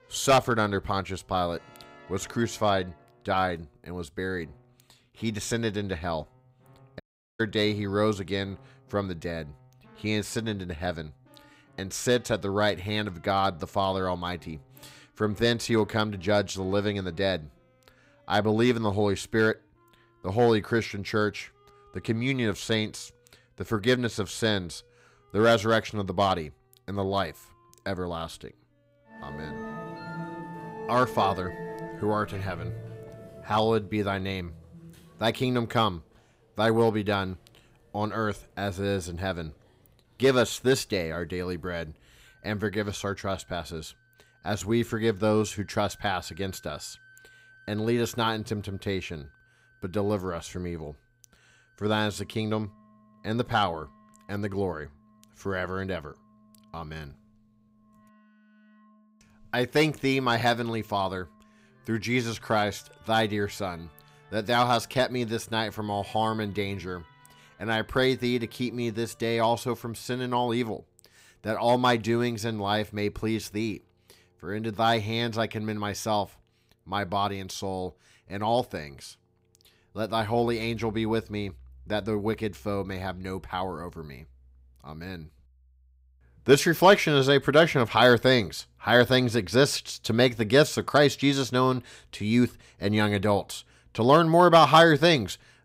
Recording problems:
background music; faint; throughout; 20 dB below the speech
audio cutting out; at 7 s

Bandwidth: 15.5 kHz